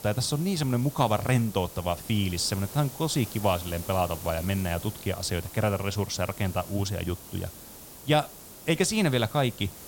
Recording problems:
hiss; noticeable; throughout; 15 dB below the speech

